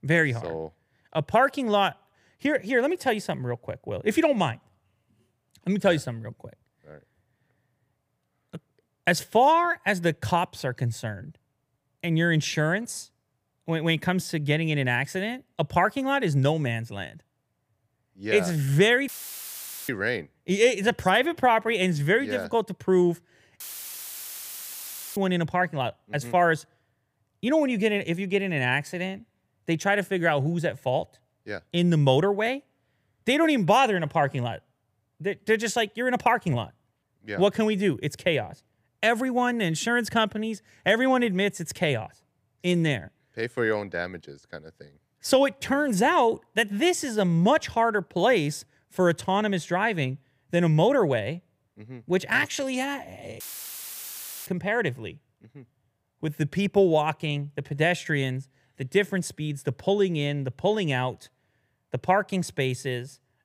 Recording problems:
audio cutting out; filled with static; at 19 s for 1 s, at 24 s for 1.5 s and at 53 s for 1 s

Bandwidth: 15 kHz